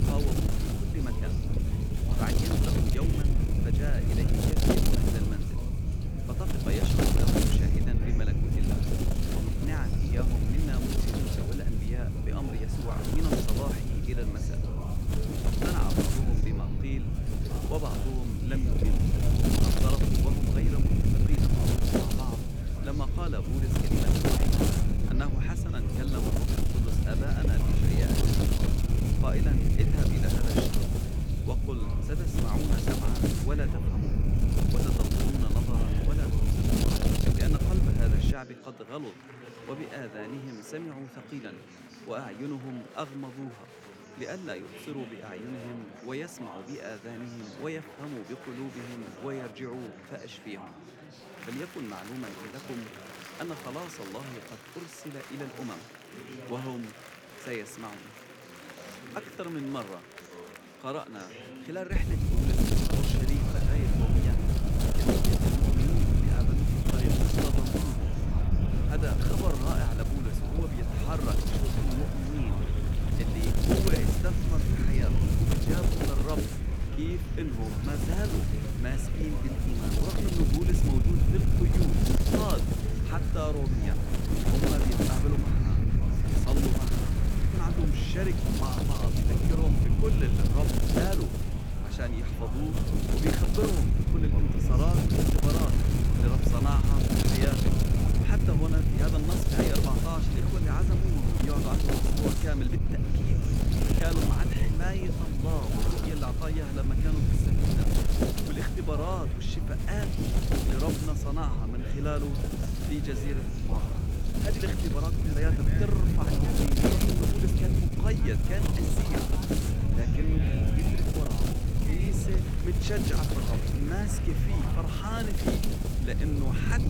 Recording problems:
wind noise on the microphone; heavy; until 38 s and from 1:02 on; 3 dB above the speech
murmuring crowd; loud; throughout; 7 dB below the speech

